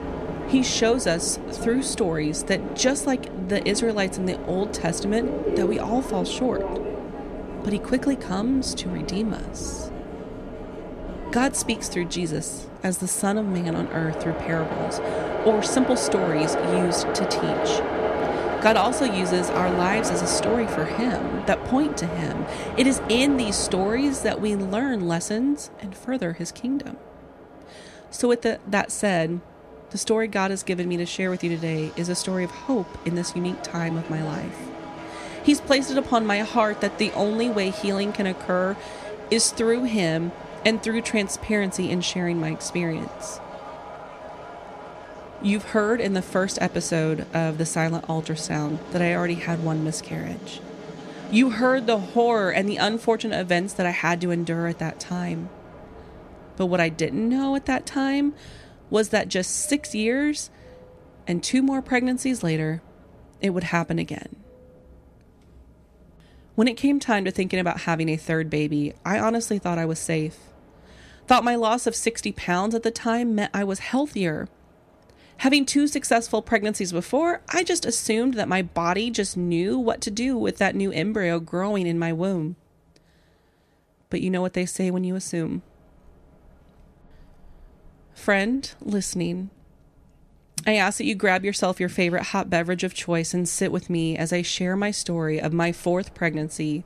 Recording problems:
train or aircraft noise; loud; throughout; 8 dB below the speech

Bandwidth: 14 kHz